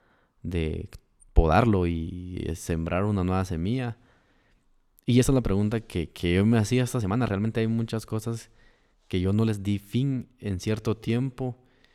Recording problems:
uneven, jittery; strongly; from 1 to 11 s

